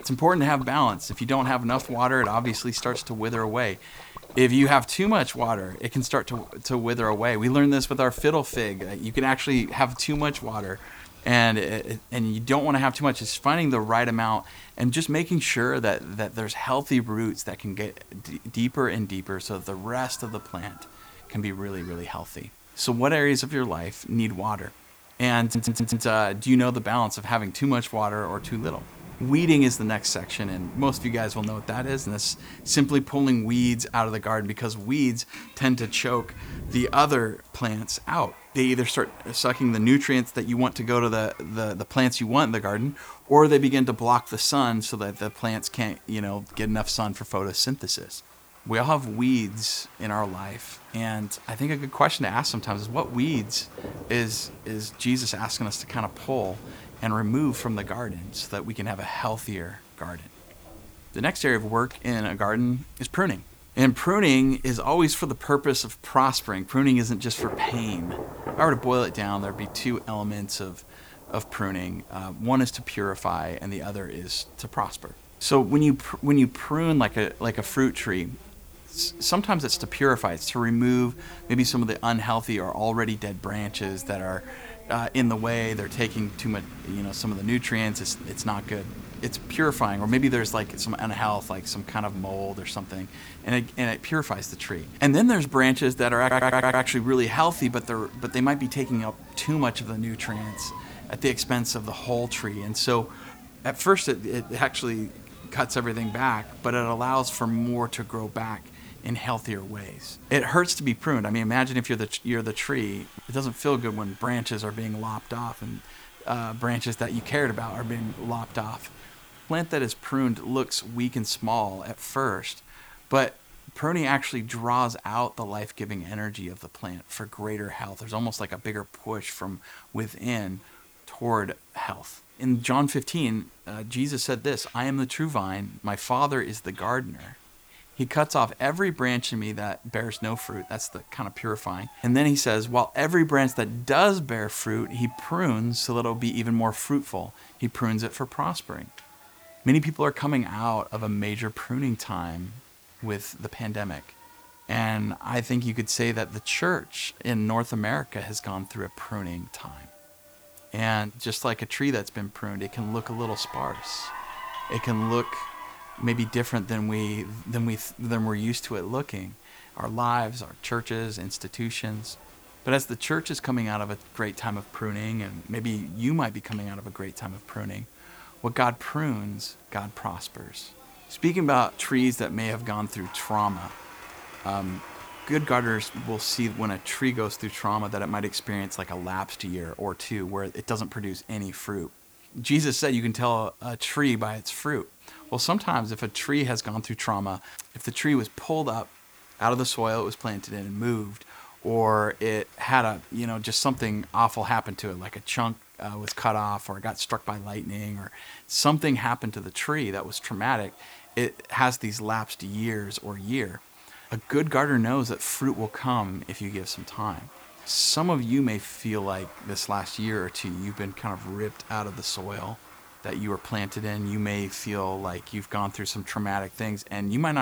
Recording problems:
rain or running water; noticeable; throughout; 20 dB below the speech
crowd noise; faint; throughout; 25 dB below the speech
hiss; faint; throughout; 25 dB below the speech
audio stuttering; at 25 s and at 1:36
abrupt cut into speech; at the end

